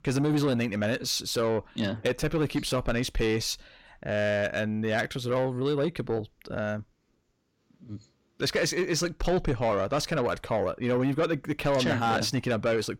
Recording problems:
distortion; slight; 10 dB below the speech

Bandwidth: 16.5 kHz